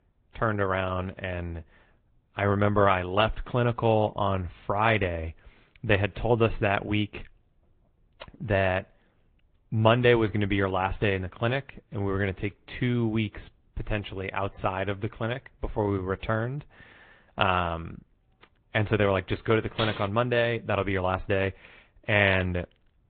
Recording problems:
high frequencies cut off; severe; nothing above 4 kHz
garbled, watery; slightly
clattering dishes; noticeable; at 20 s; peak 9 dB below the speech

